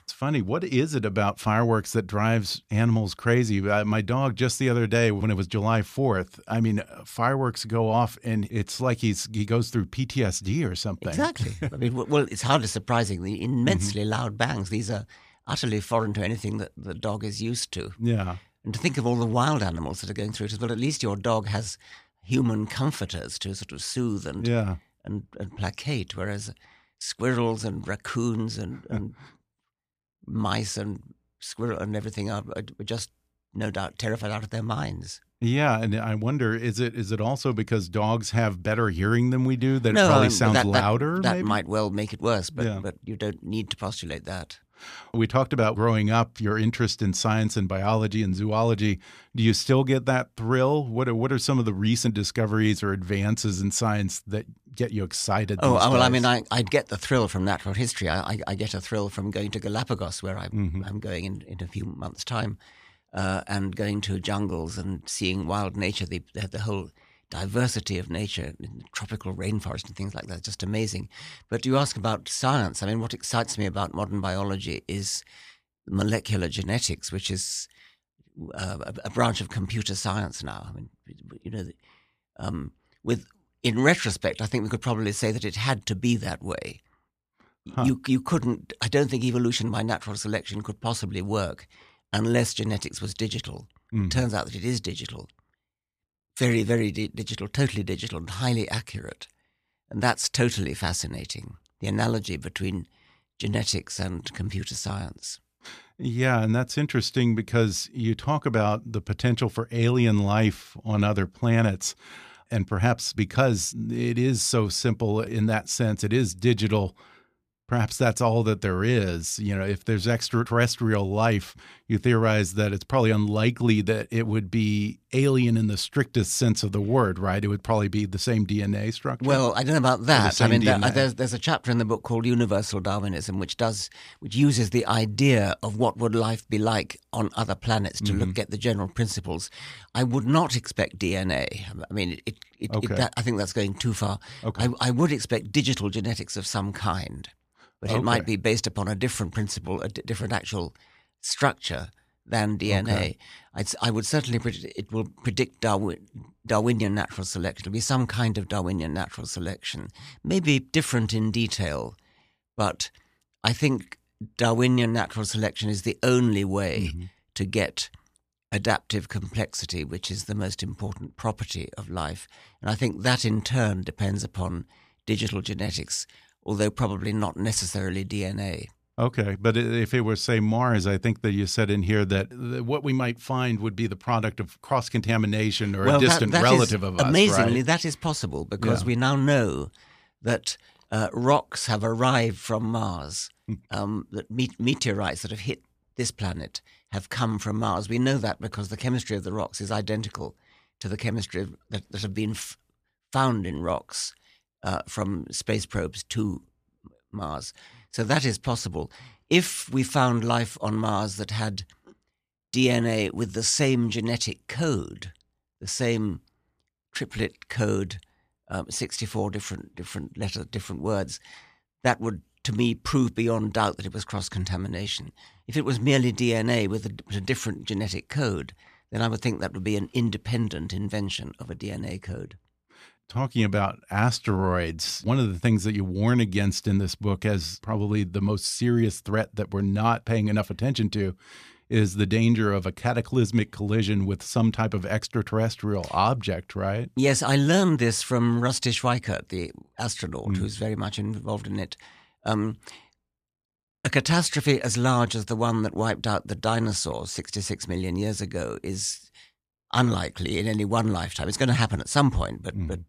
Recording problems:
none

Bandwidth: 14.5 kHz